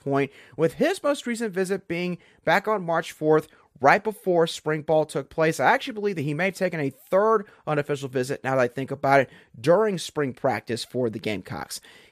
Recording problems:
none

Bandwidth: 14.5 kHz